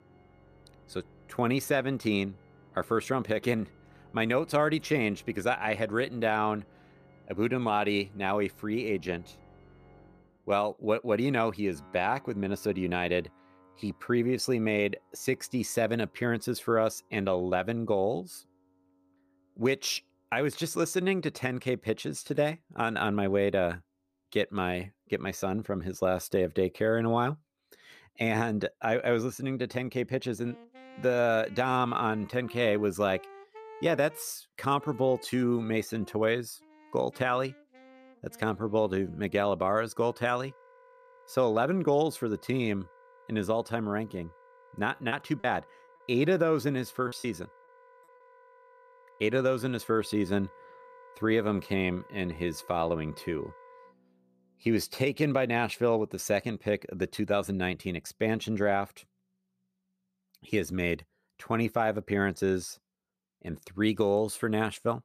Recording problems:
background music; faint; throughout; 25 dB below the speech
choppy; very; from 45 to 47 s; 8% of the speech affected

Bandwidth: 14.5 kHz